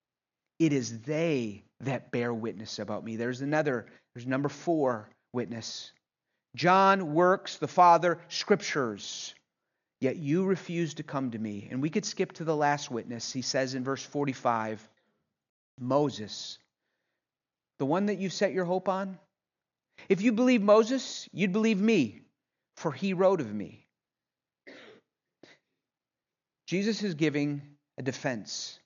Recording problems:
high frequencies cut off; noticeable; nothing above 7 kHz

